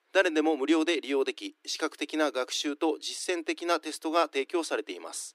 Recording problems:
thin; somewhat; fading below 300 Hz

